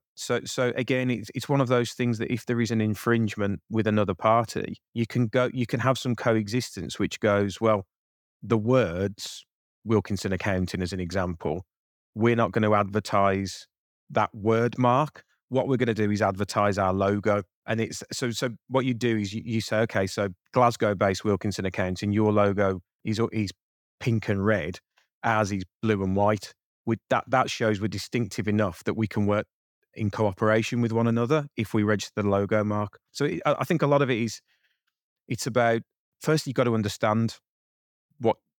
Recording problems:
none

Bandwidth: 18.5 kHz